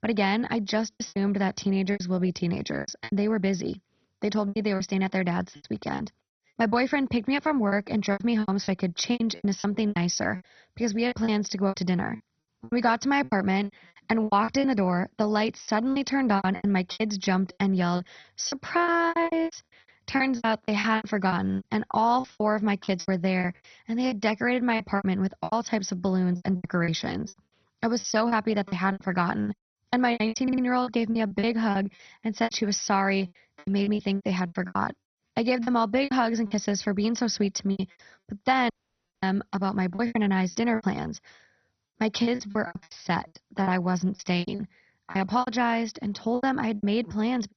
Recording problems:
garbled, watery; badly; nothing above 6 kHz
choppy; very; 15% of the speech affected
audio stuttering; at 30 s
audio cutting out; at 39 s for 0.5 s

